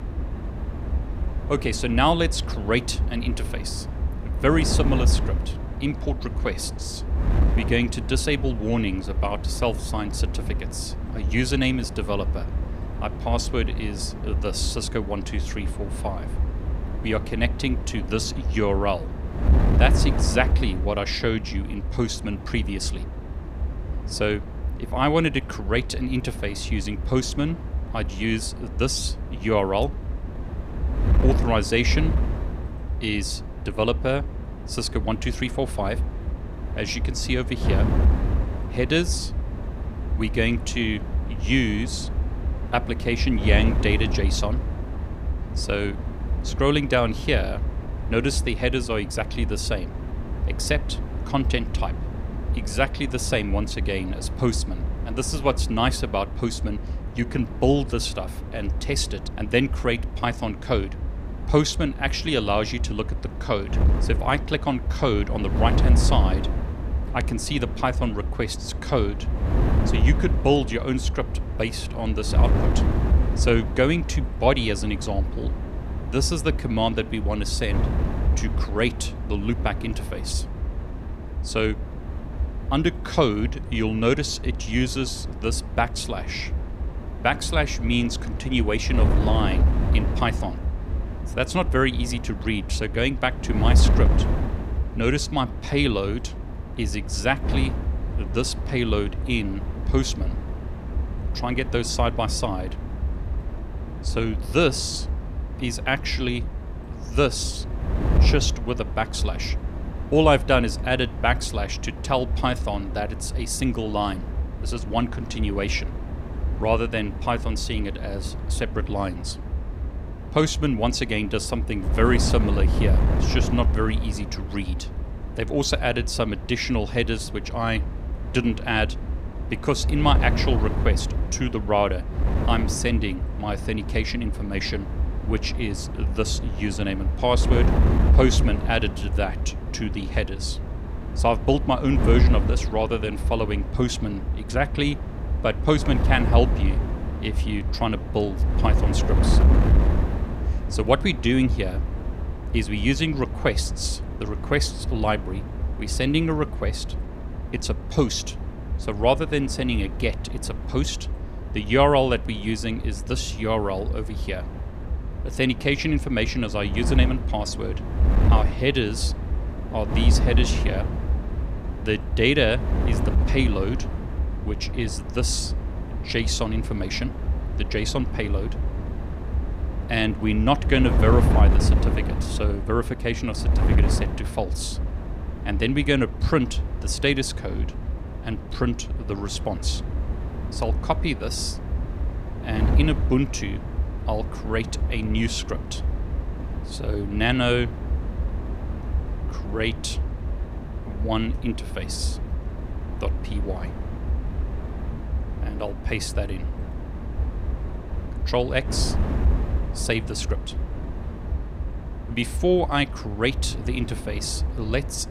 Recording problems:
wind noise on the microphone; occasional gusts; 10 dB below the speech

